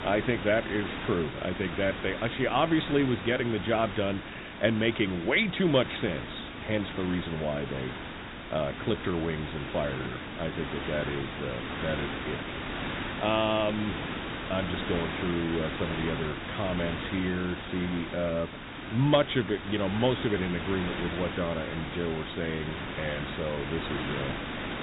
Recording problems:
high frequencies cut off; severe; nothing above 4 kHz
hiss; loud; throughout; 6 dB below the speech

